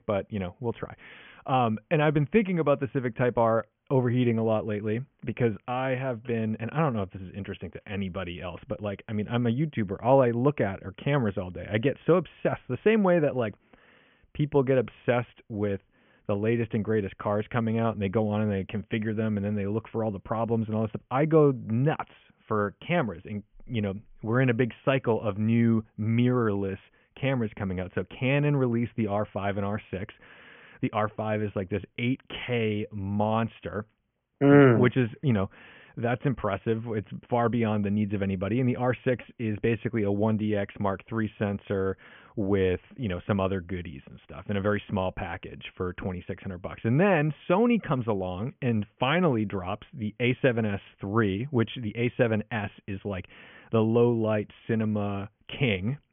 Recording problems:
high frequencies cut off; severe; nothing above 3.5 kHz

